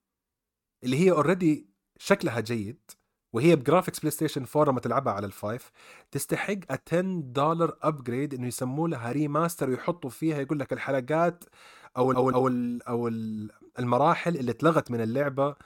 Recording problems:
audio stuttering; at 12 s

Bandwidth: 17.5 kHz